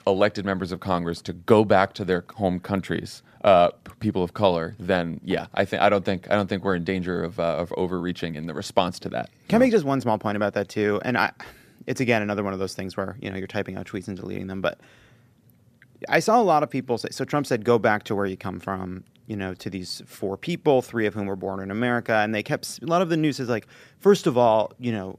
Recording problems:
none

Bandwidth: 14.5 kHz